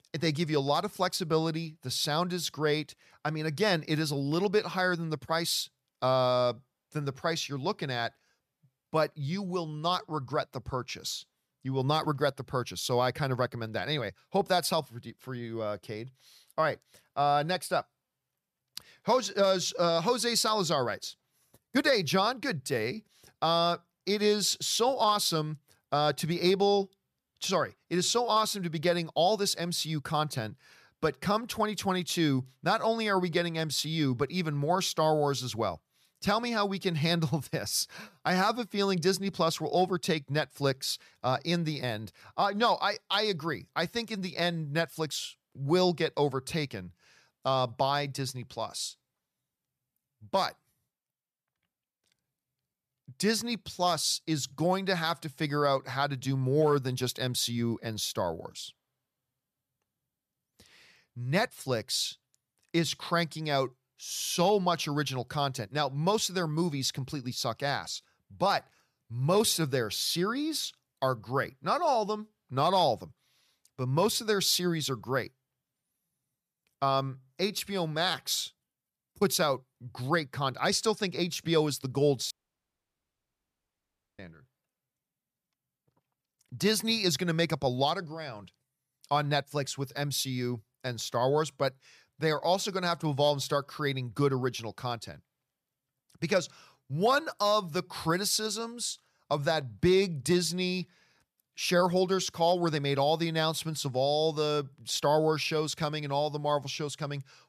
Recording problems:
audio cutting out; at 1:22 for 2 s

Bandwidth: 14.5 kHz